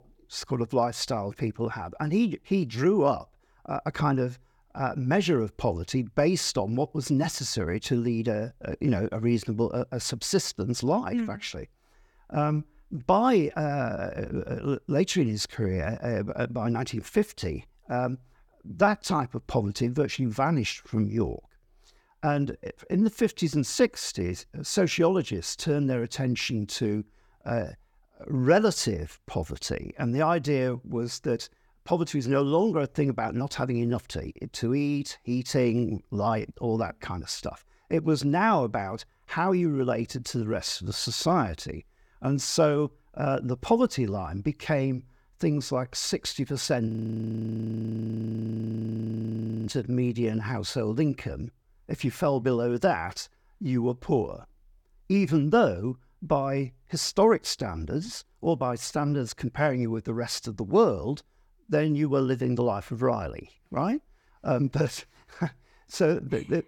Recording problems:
audio freezing; at 47 s for 3 s

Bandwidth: 18 kHz